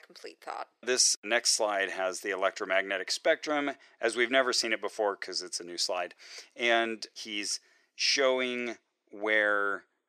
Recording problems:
thin; very; fading below 400 Hz

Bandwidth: 14 kHz